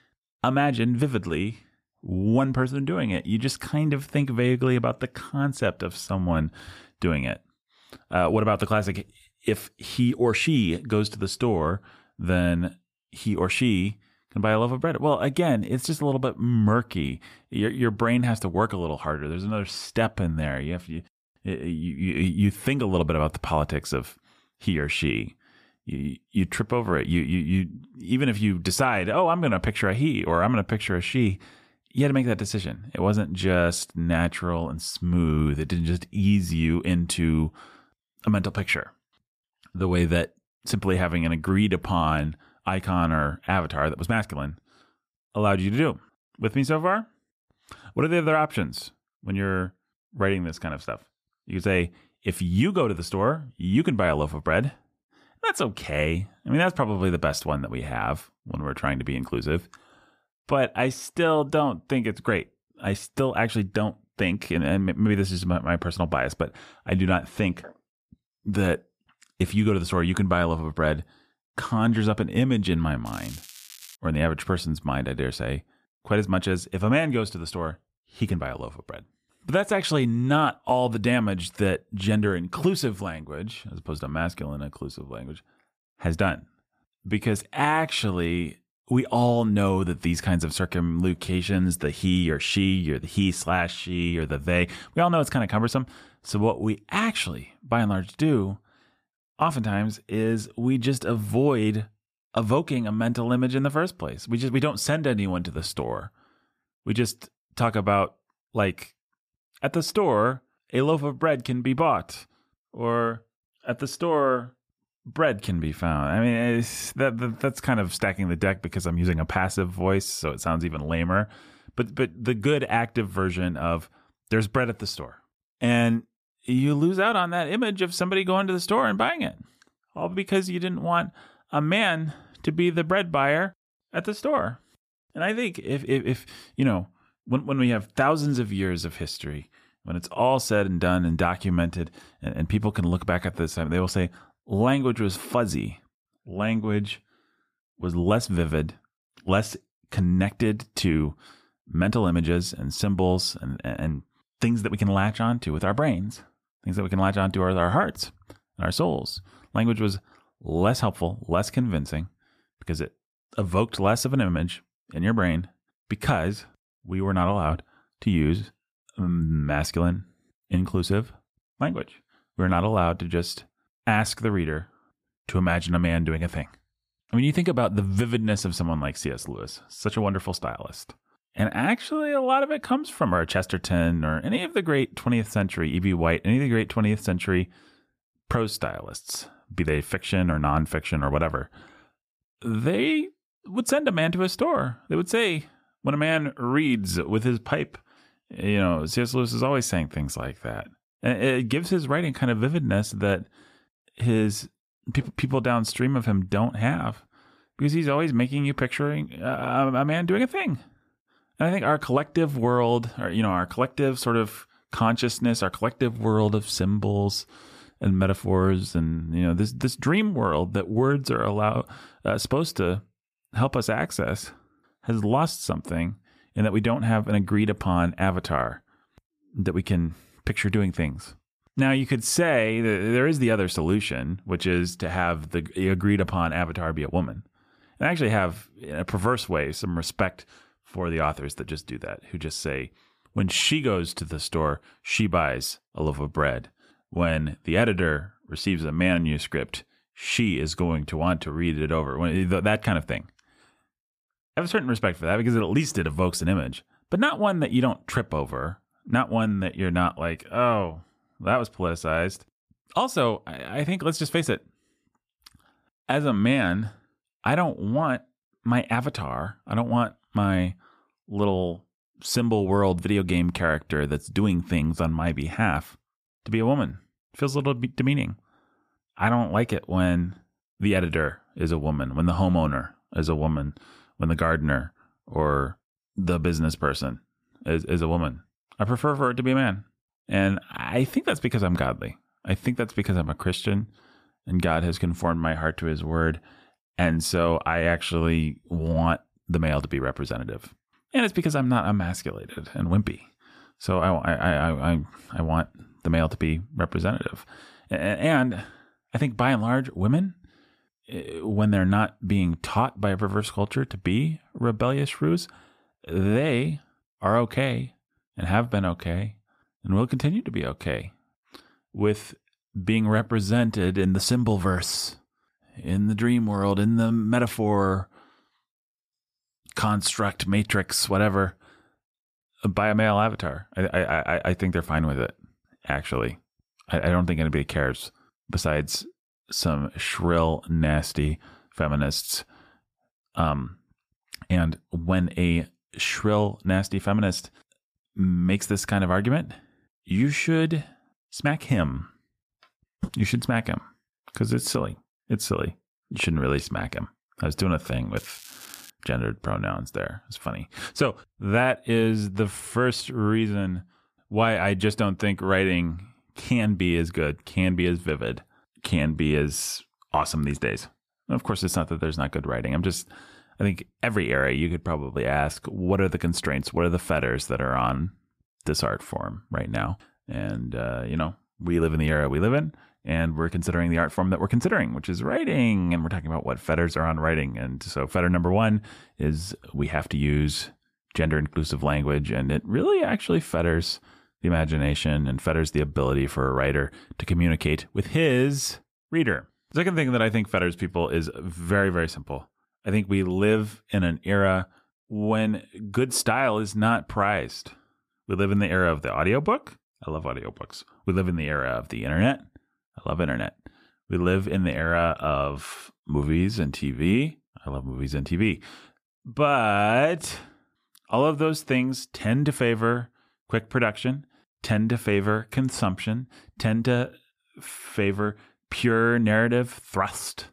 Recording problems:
crackling; noticeable; at 1:13 and at 5:58; 20 dB below the speech

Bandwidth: 14.5 kHz